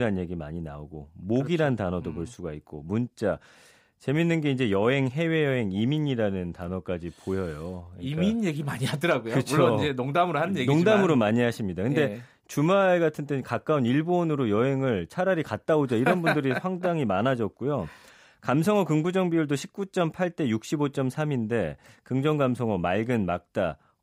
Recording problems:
abrupt cut into speech; at the start

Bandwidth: 15.5 kHz